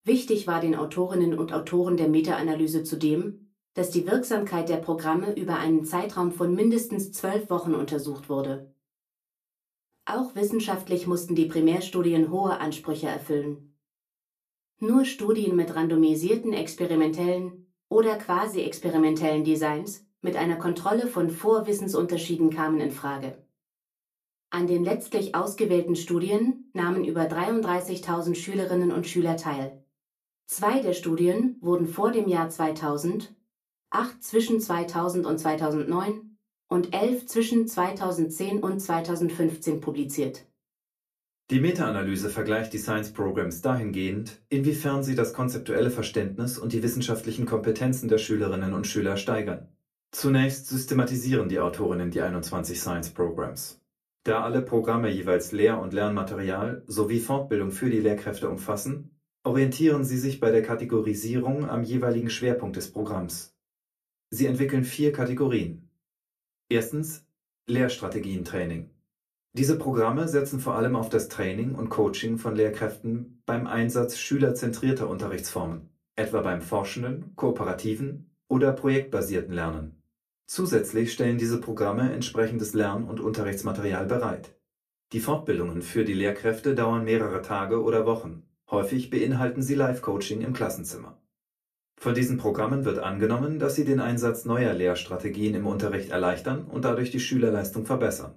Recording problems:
off-mic speech; far
room echo; very slight; dies away in 0.2 s

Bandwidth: 14.5 kHz